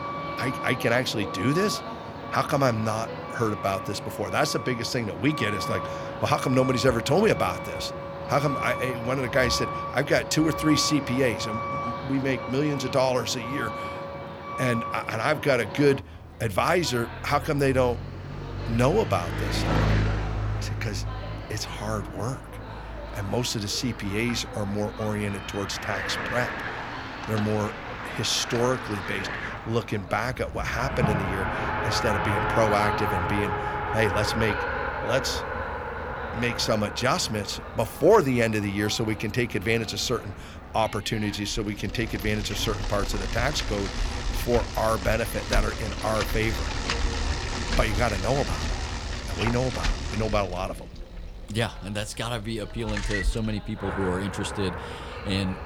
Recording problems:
traffic noise; loud; throughout; 5 dB below the speech
voice in the background; noticeable; throughout; 20 dB below the speech

